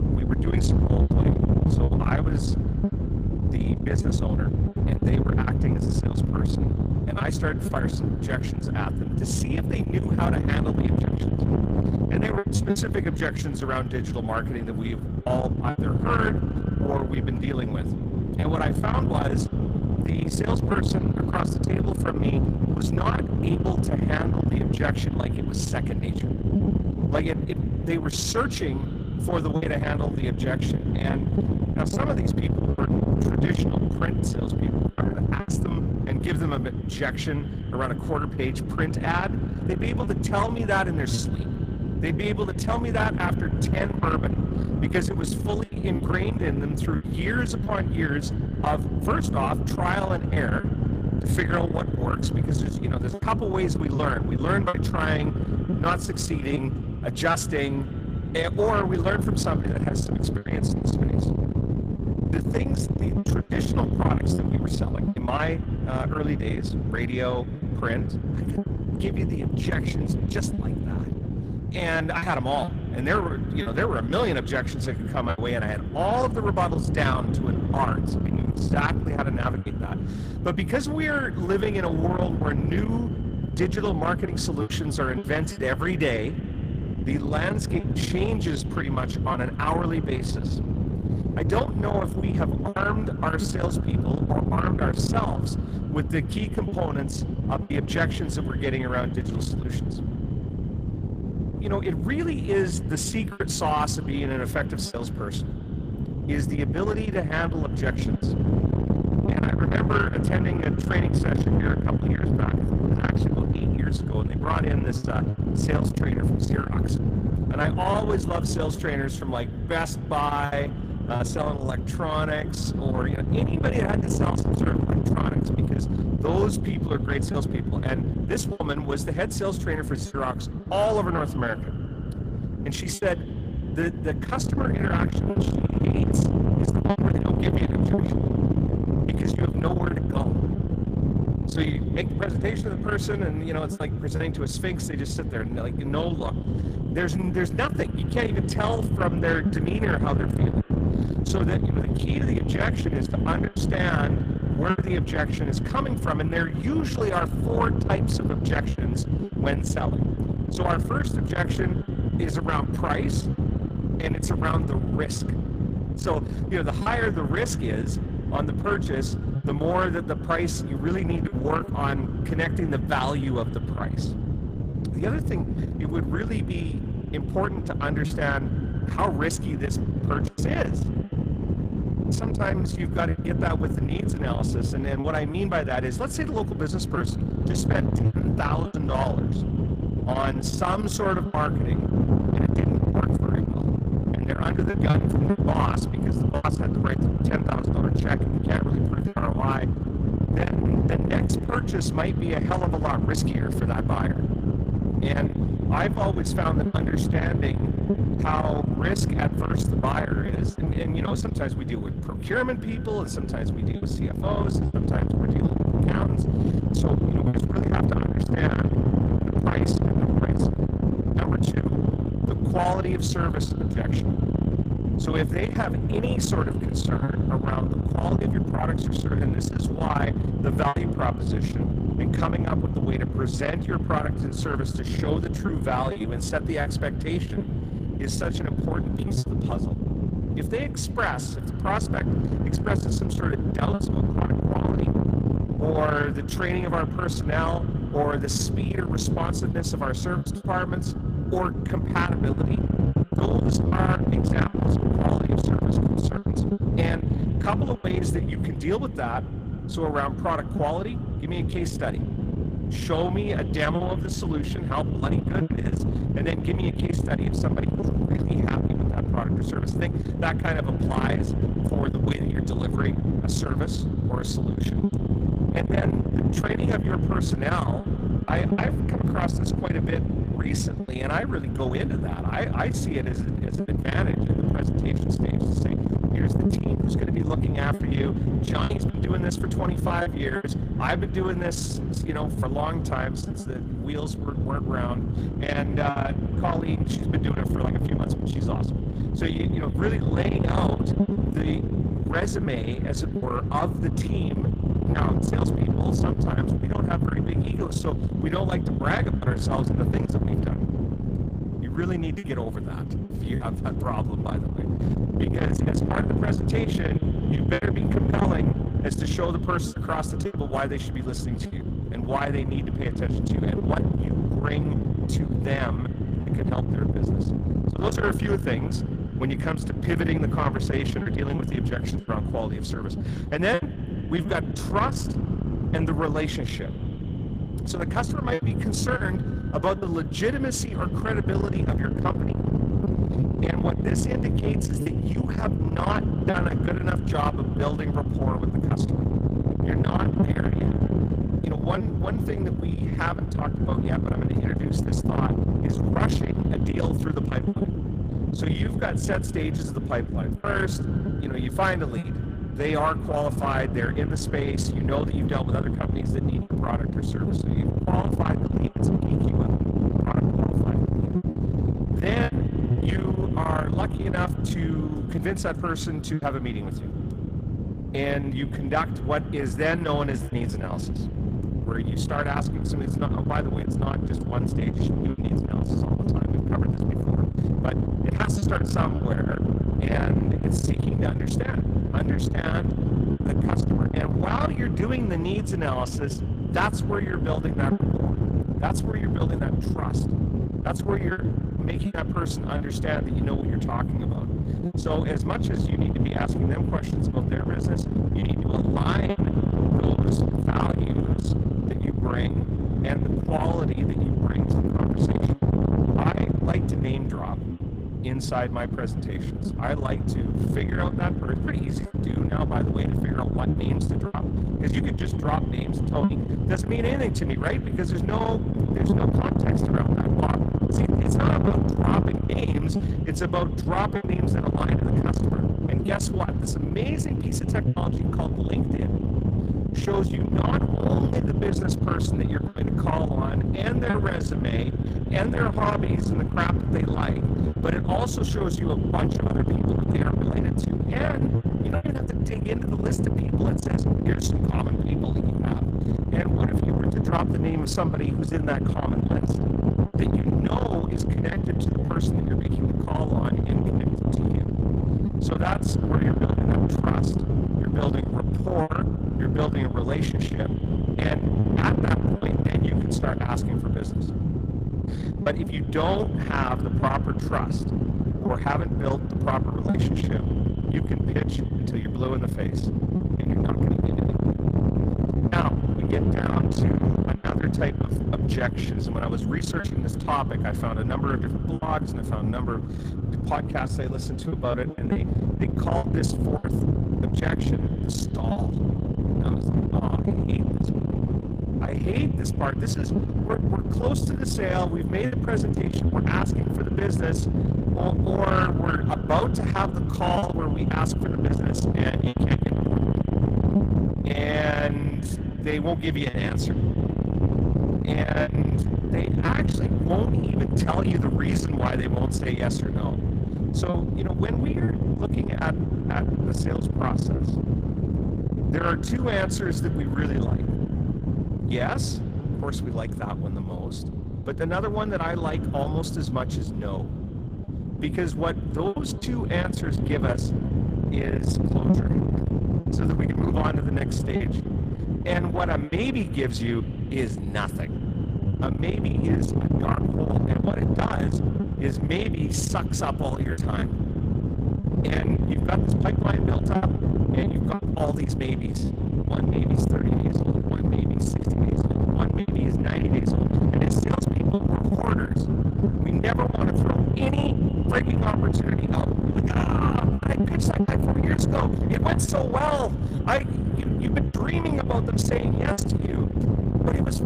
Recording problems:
distortion; heavy; 7 dB below the speech
echo of what is said; faint; throughout; 110 ms later, 25 dB below the speech
garbled, watery; slightly; nothing above 15 kHz
low rumble; loud; throughout; 5 dB below the speech
choppy; occasionally; 3% of the speech affected

